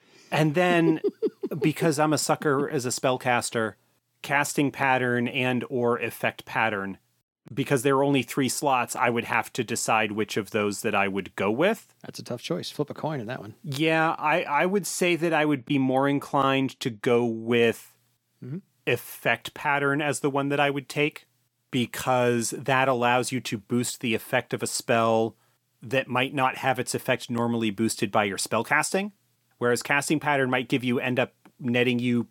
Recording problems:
none

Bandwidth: 17 kHz